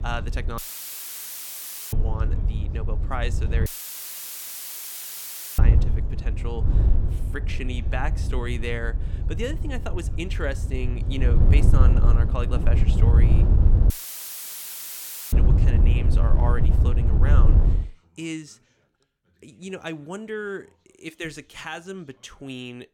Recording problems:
wind noise on the microphone; heavy; until 18 s; 4 dB below the speech
background chatter; faint; throughout; 2 voices, 30 dB below the speech
audio cutting out; filled with static; at 0.5 s for 1.5 s, at 3.5 s for 2 s and at 14 s for 1.5 s

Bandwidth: 17 kHz